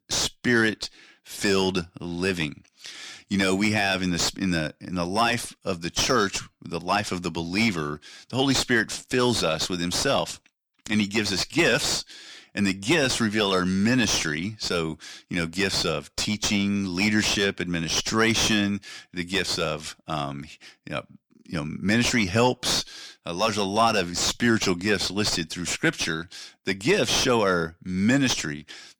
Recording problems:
distortion; heavy; 6 dB below the speech

